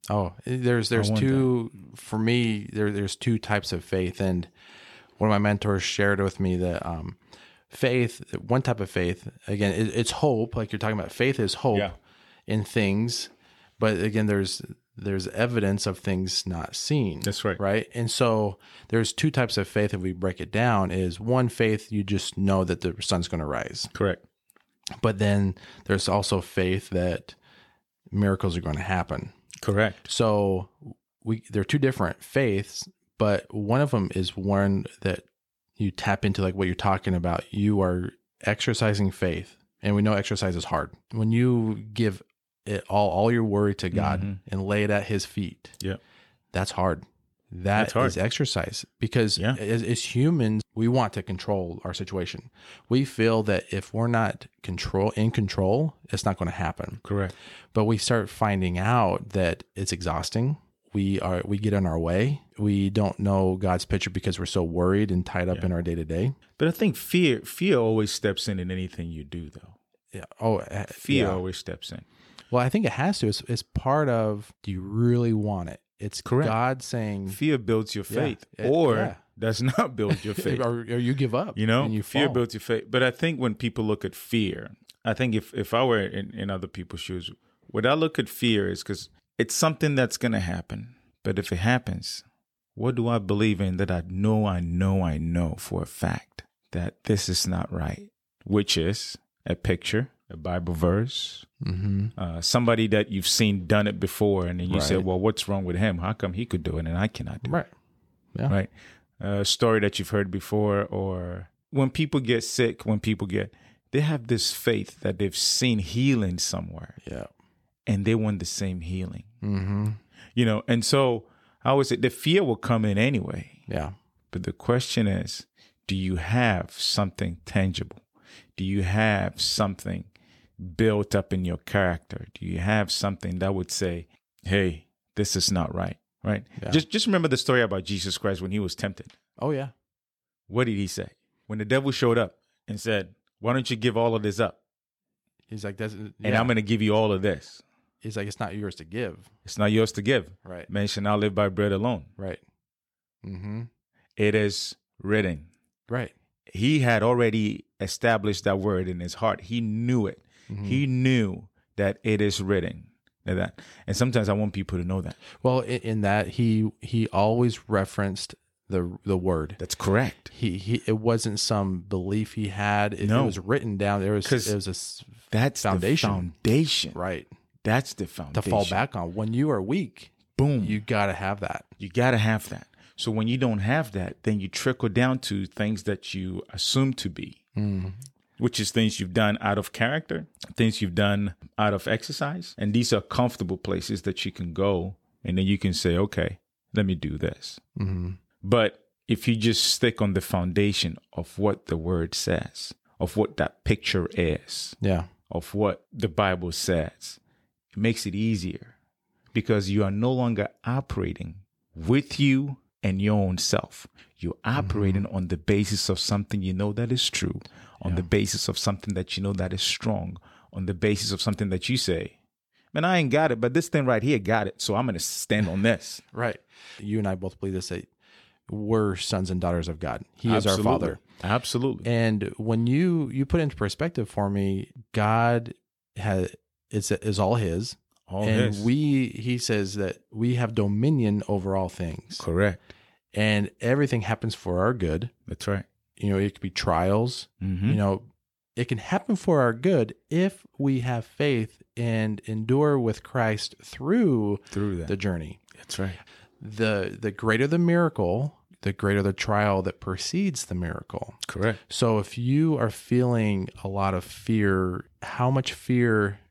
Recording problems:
none

